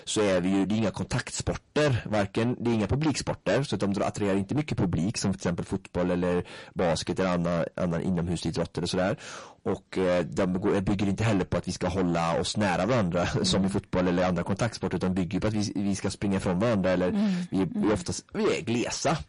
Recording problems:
distortion; heavy; 6 dB below the speech
garbled, watery; slightly; nothing above 10.5 kHz

